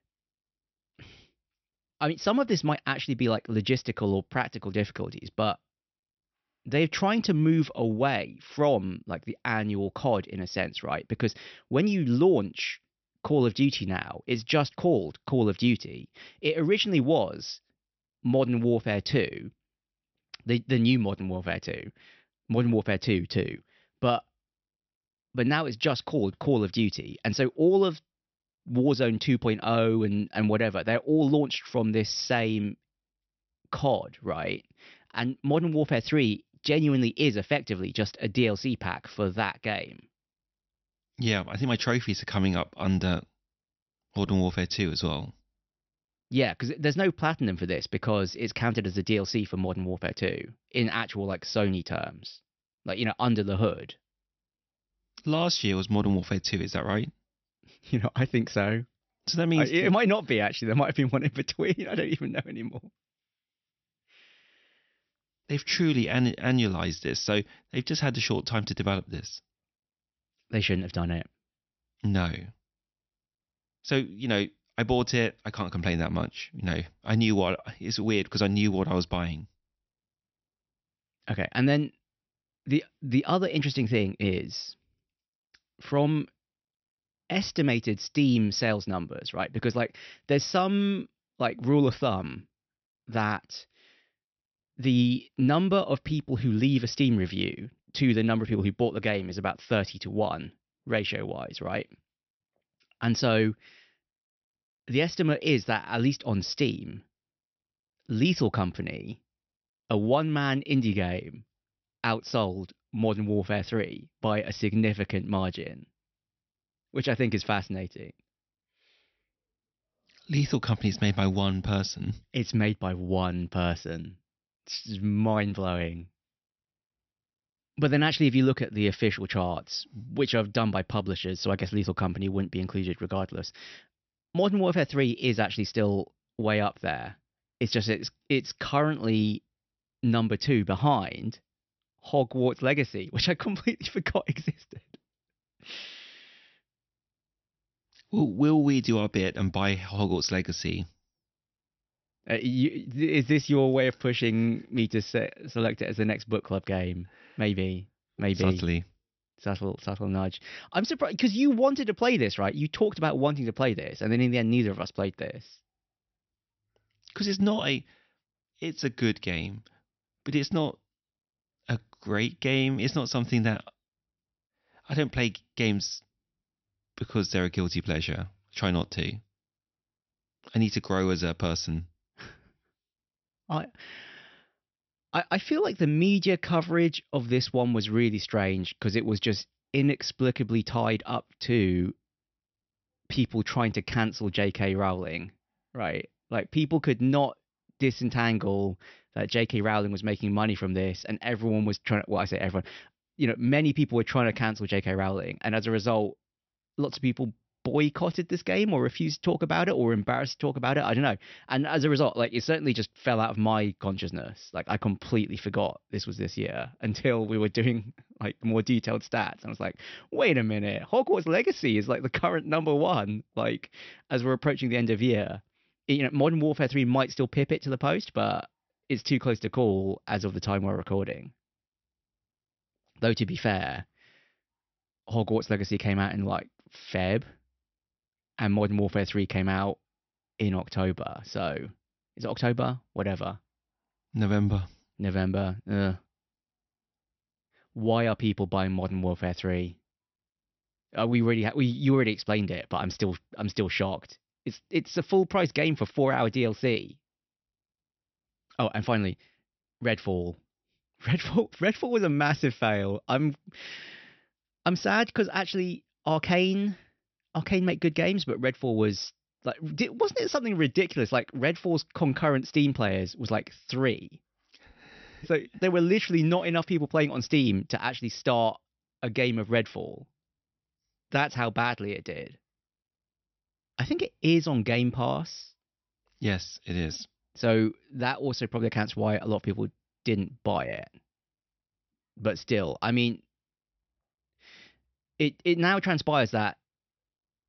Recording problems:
high frequencies cut off; noticeable; nothing above 6 kHz

